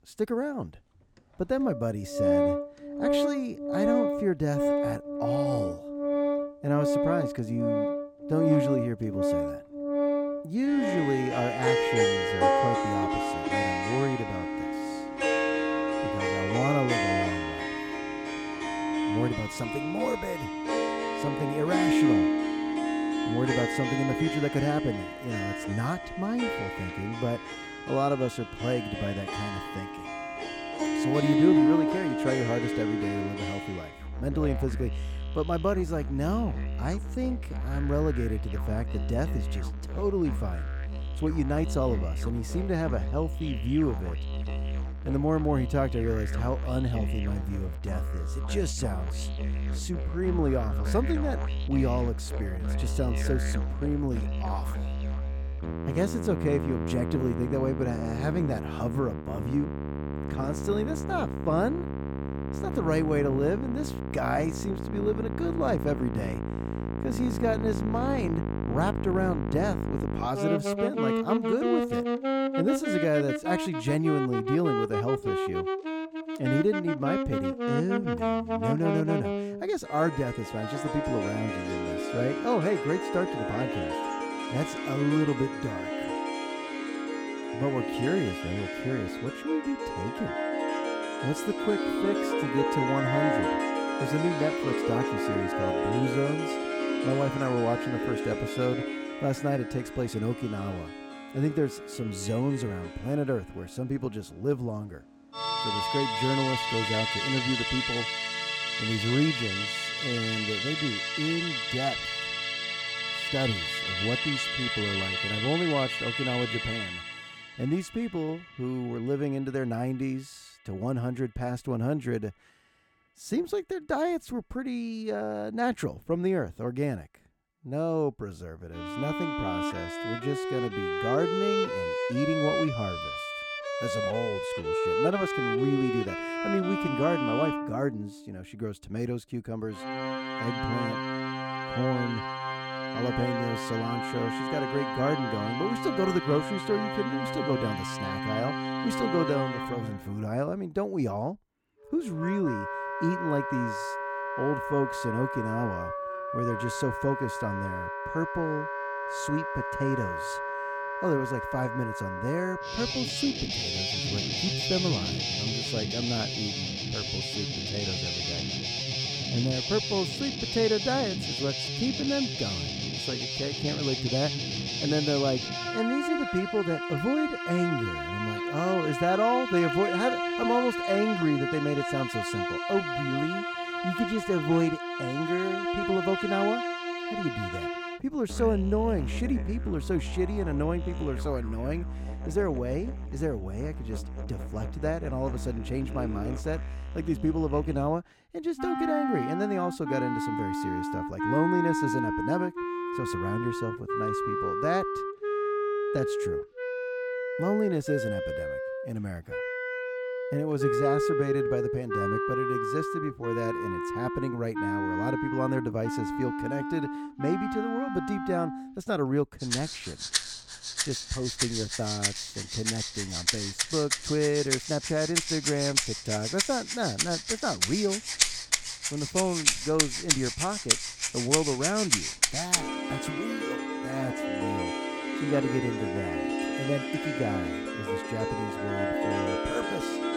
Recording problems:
background music; very loud; throughout; as loud as the speech

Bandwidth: 17.5 kHz